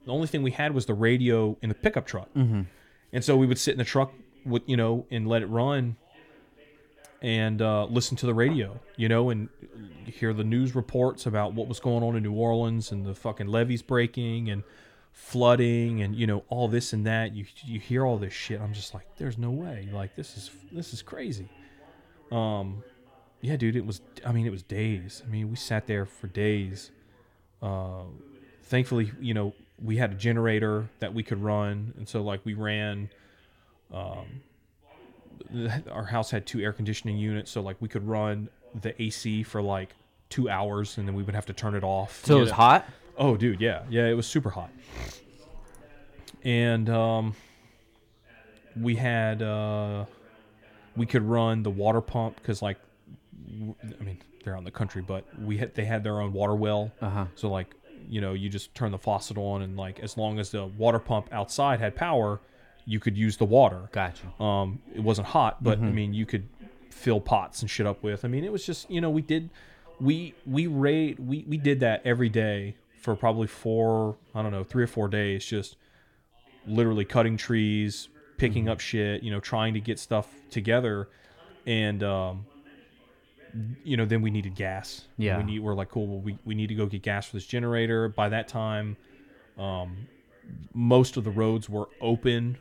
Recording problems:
background chatter; faint; throughout; 2 voices, 30 dB below the speech
uneven, jittery; slightly; from 1.5 s to 1:18

